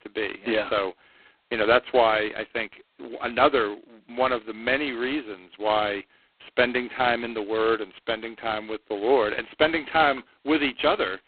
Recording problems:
phone-call audio; poor line; nothing above 4 kHz

